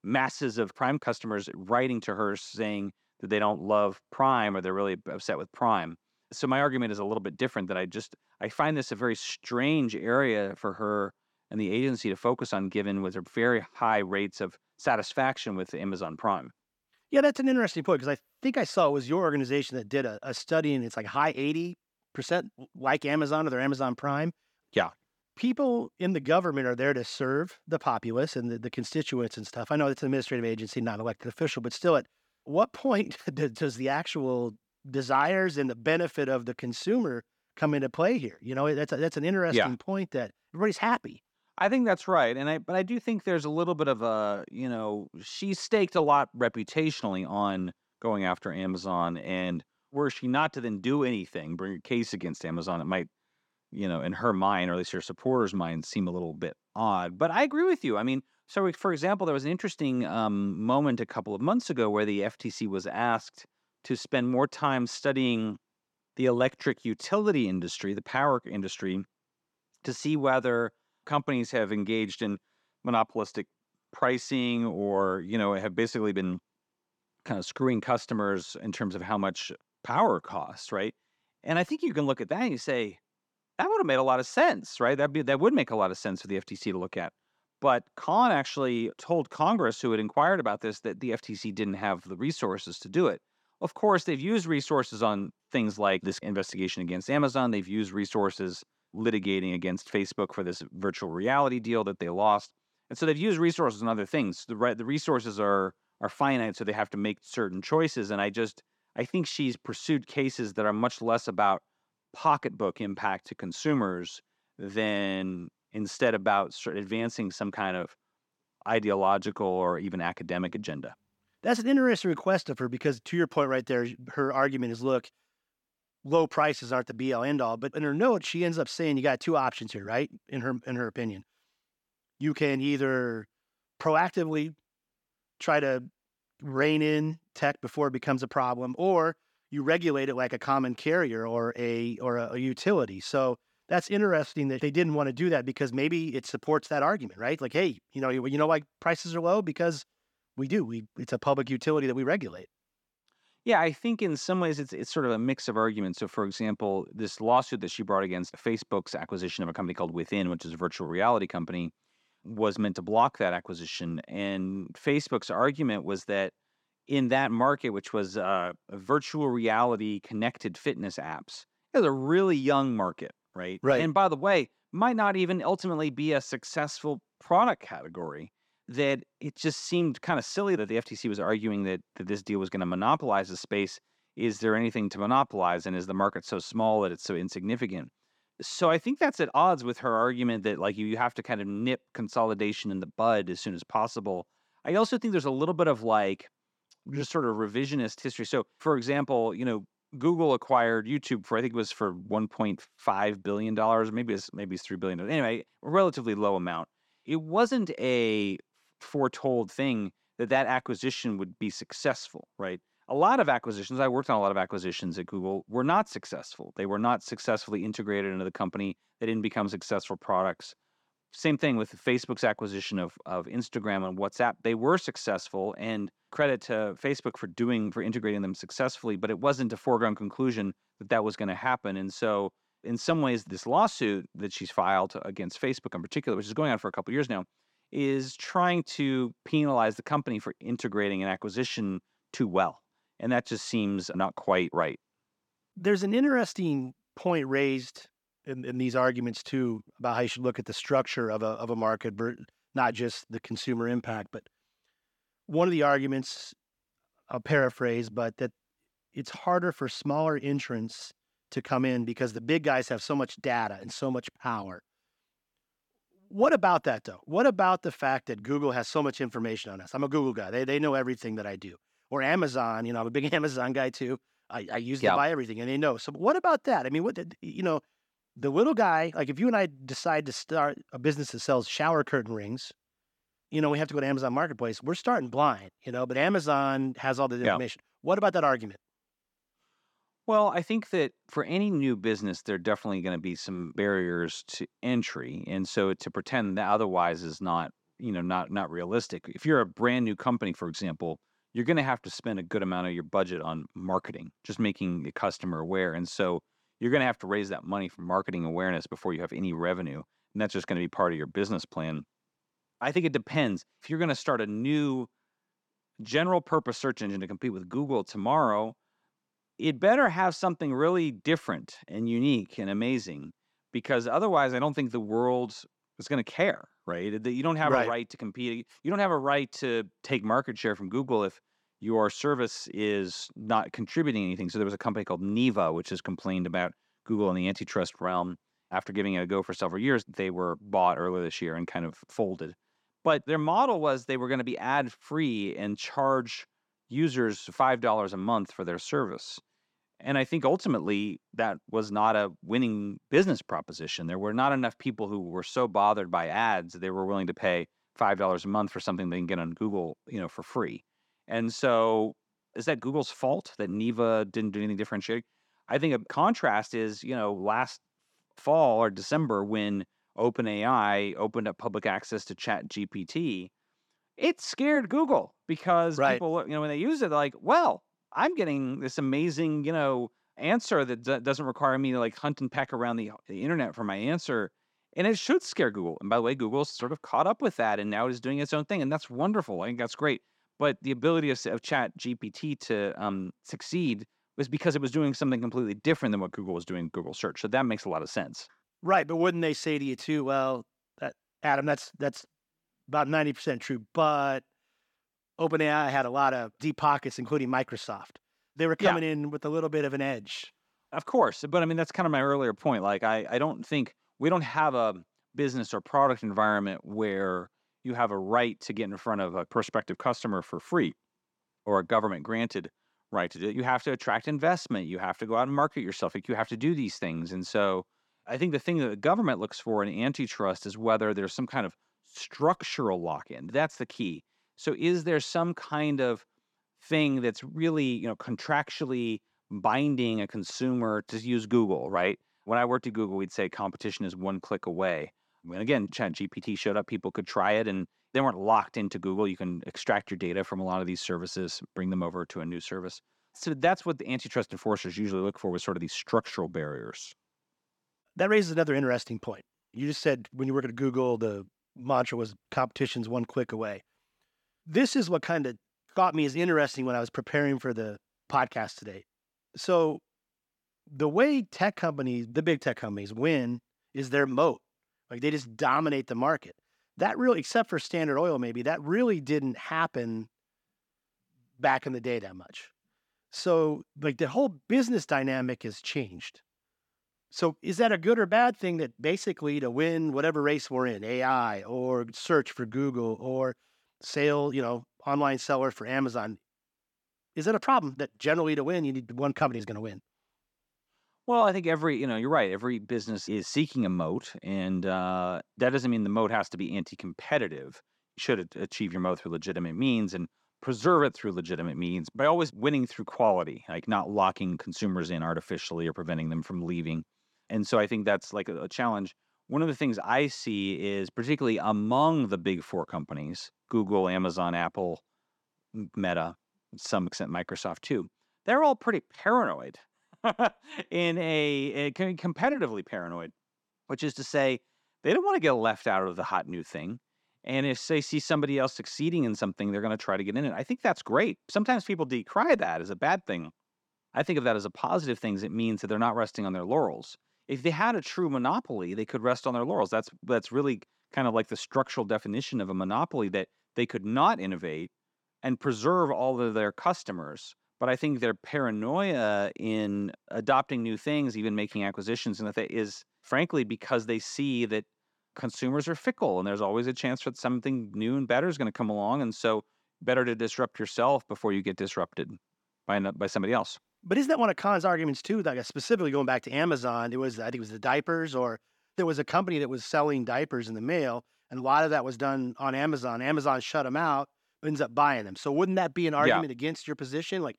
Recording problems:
none

